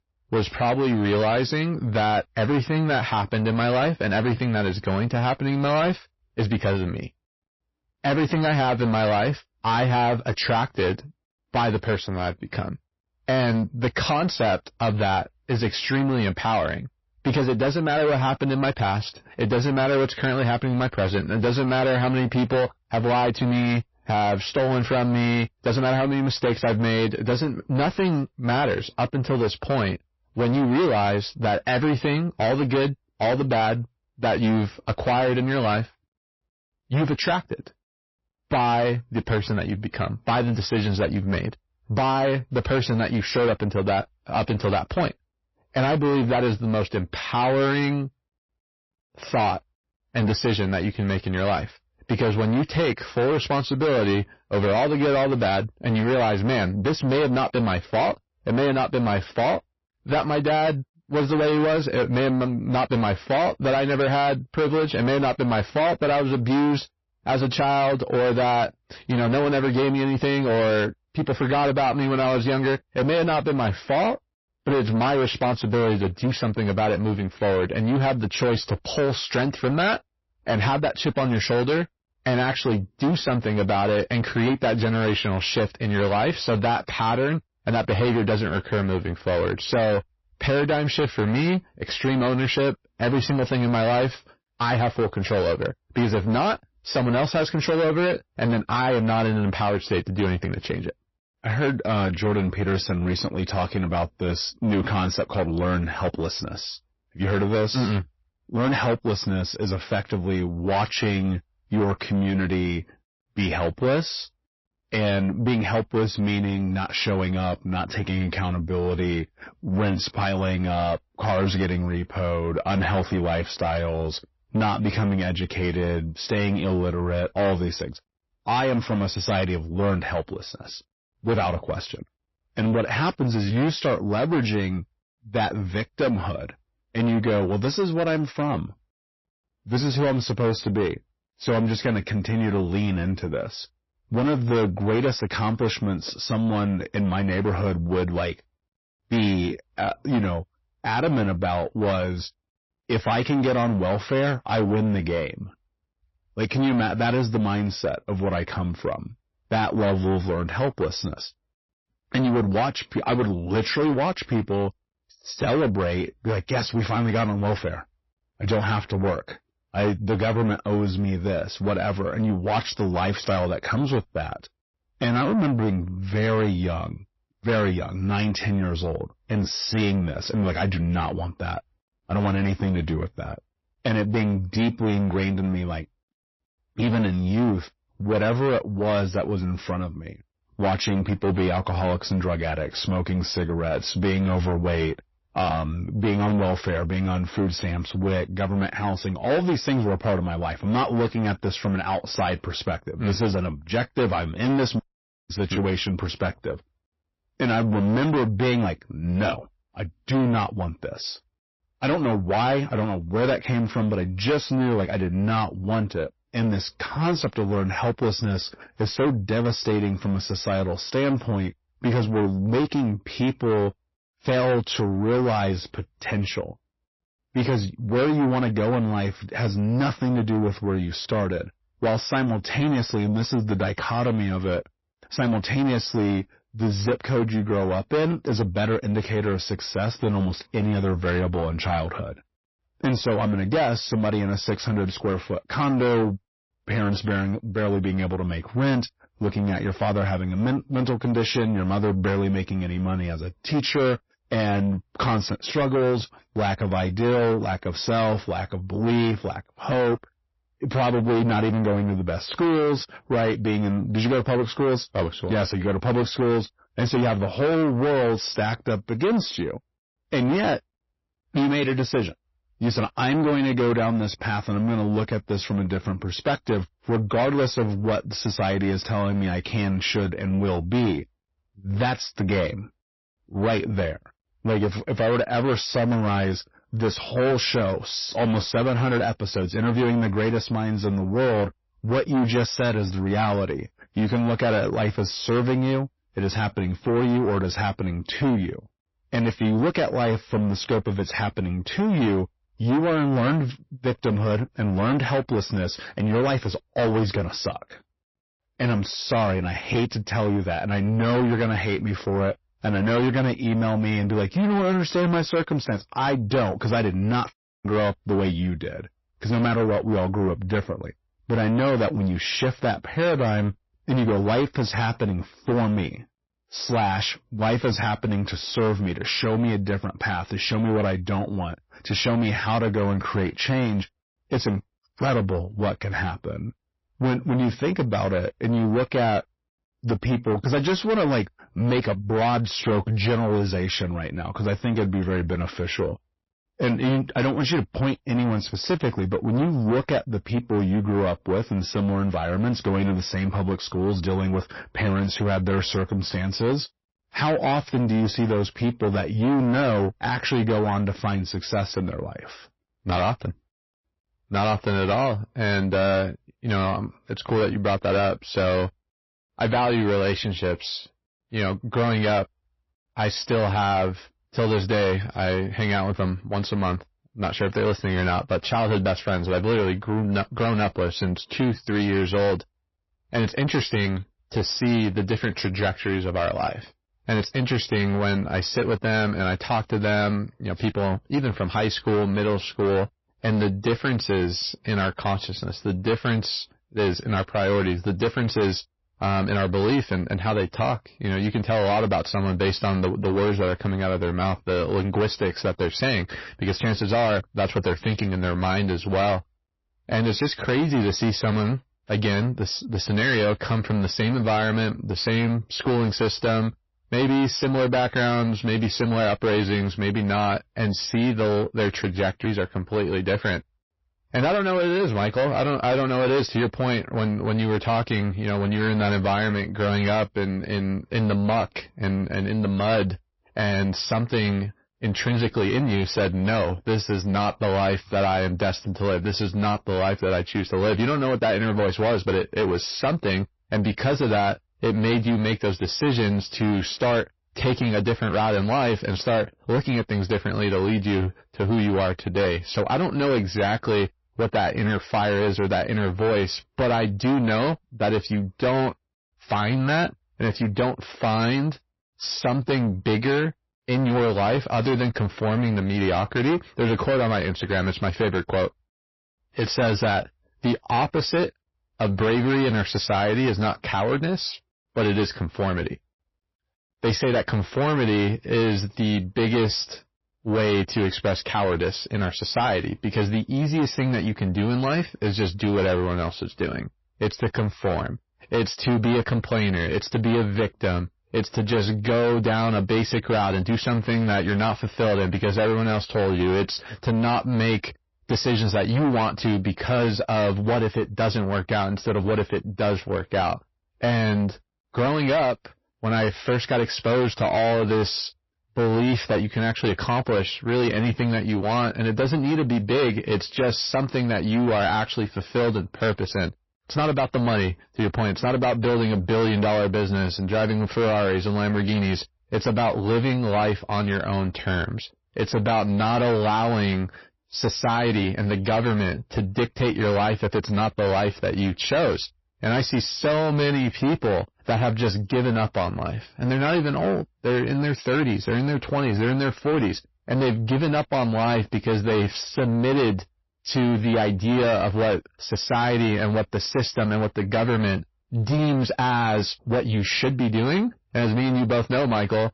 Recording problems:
distortion; heavy; 7 dB below the speech
garbled, watery; slightly; nothing above 5.5 kHz

